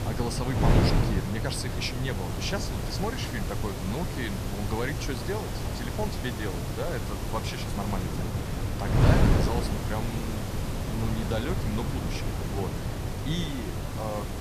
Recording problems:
wind noise on the microphone; heavy; 1 dB below the speech
hiss; loud; throughout; 7 dB below the speech
murmuring crowd; noticeable; throughout; 20 dB below the speech

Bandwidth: 14.5 kHz